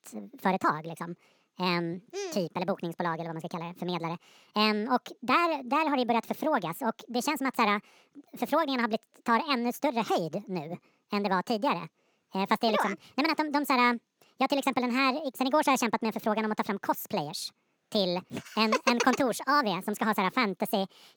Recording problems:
wrong speed and pitch; too fast and too high; 1.6 times normal speed

